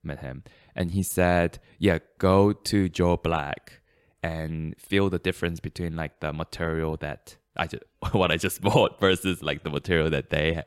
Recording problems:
none

